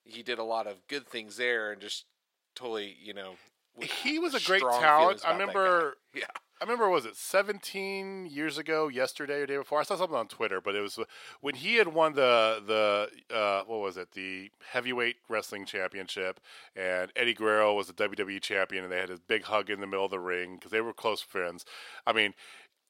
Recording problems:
thin; somewhat; fading below 500 Hz

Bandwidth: 16 kHz